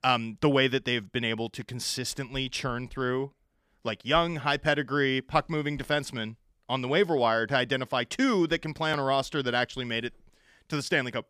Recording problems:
none

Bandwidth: 15 kHz